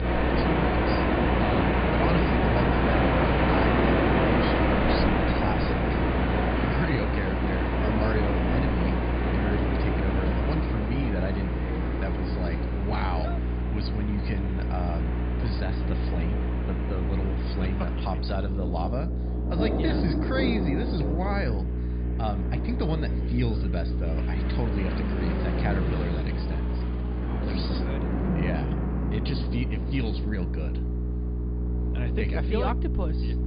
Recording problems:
high frequencies cut off; severe; nothing above 5 kHz
rain or running water; very loud; throughout; 5 dB above the speech
electrical hum; loud; throughout; 60 Hz, 6 dB below the speech
traffic noise; loud; until 13 s; 4 dB below the speech
train or aircraft noise; loud; throughout; 9 dB below the speech

